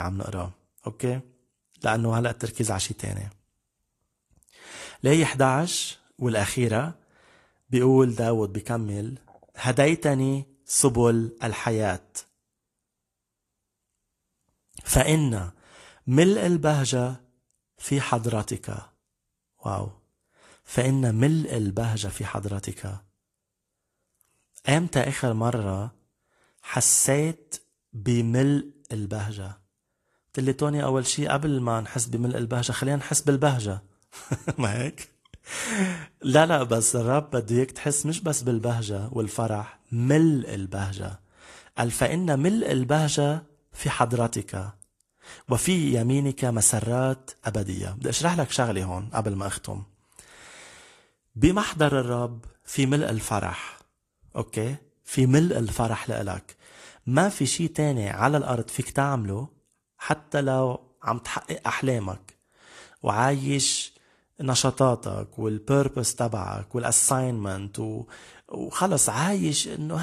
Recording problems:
garbled, watery; slightly
abrupt cut into speech; at the start and the end

